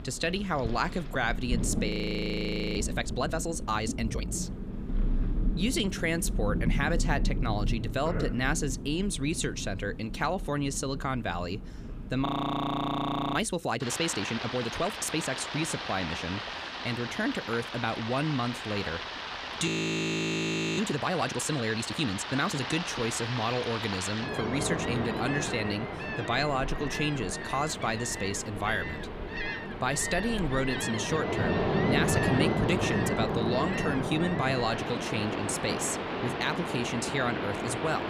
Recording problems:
rain or running water; loud; throughout; 3 dB below the speech
audio freezing; at 2 s for 1 s, at 12 s for 1 s and at 20 s for 1 s

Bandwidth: 14.5 kHz